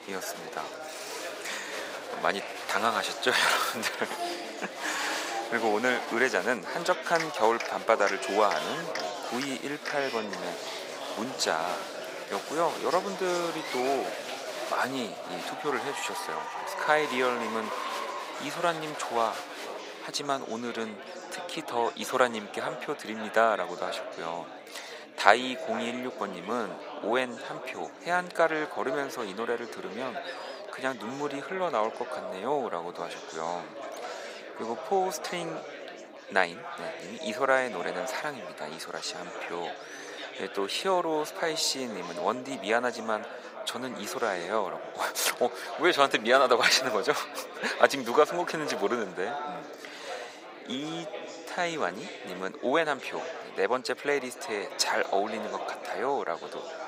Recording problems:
thin; very; fading below 650 Hz
echo of what is said; noticeable; throughout; 470 ms later, 15 dB below the speech
chatter from many people; loud; throughout; 9 dB below the speech

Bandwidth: 15.5 kHz